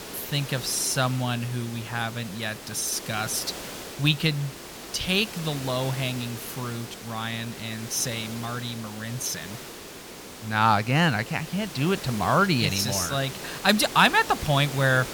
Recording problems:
hiss; noticeable; throughout; 10 dB below the speech

